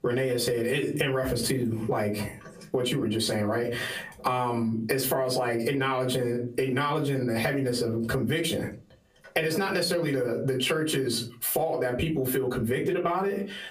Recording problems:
off-mic speech; far
squashed, flat; heavily
room echo; very slight; dies away in 0.2 s

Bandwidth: 15 kHz